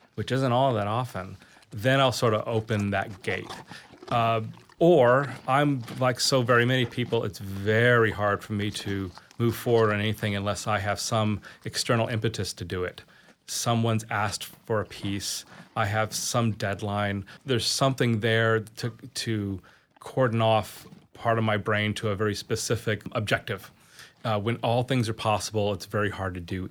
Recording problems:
animal sounds; faint; throughout; 25 dB below the speech

